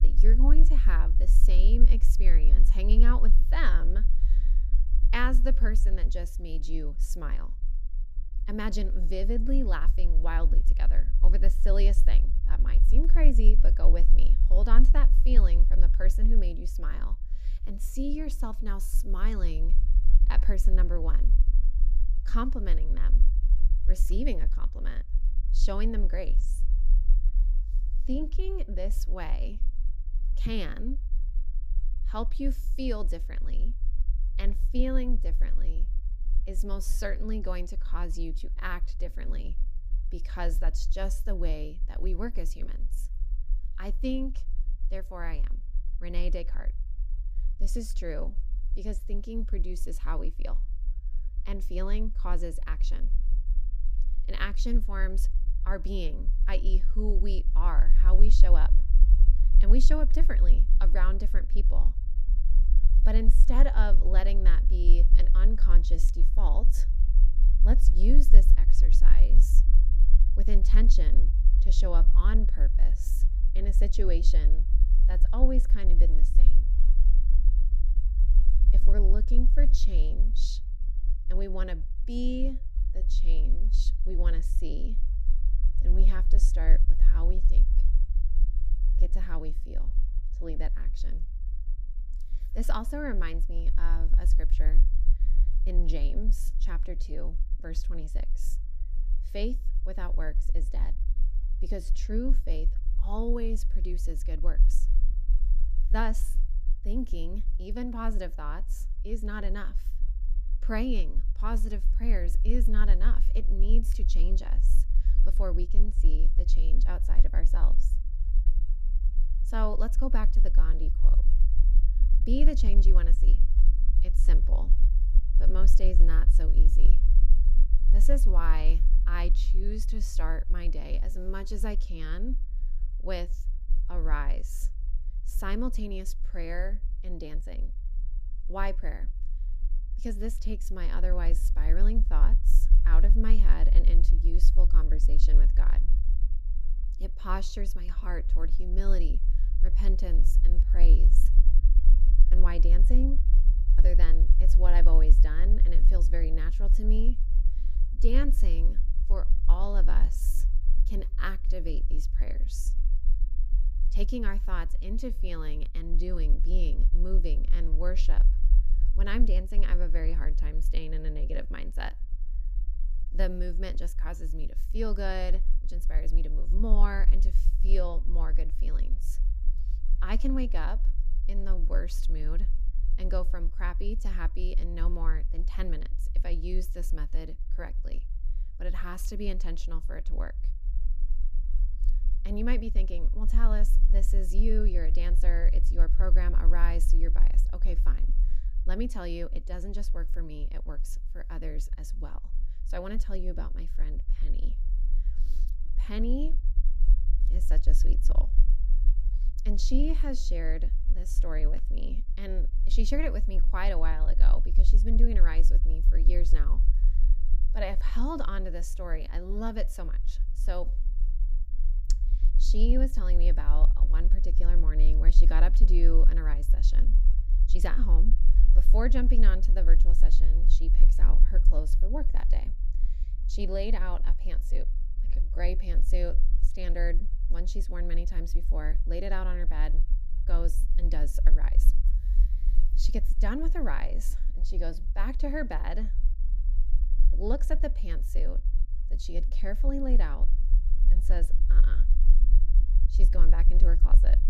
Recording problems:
low rumble; noticeable; throughout; 15 dB below the speech

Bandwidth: 14.5 kHz